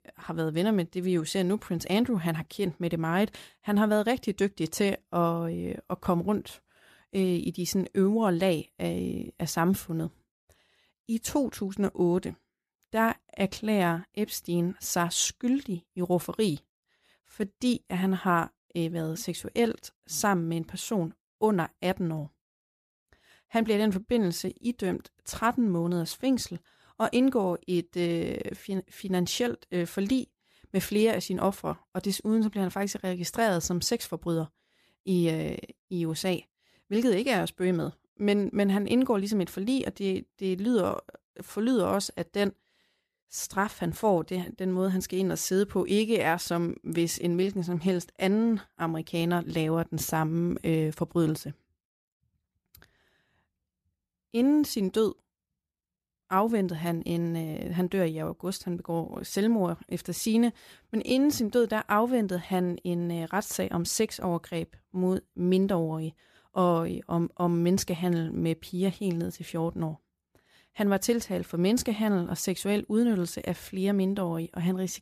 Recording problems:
none

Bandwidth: 14.5 kHz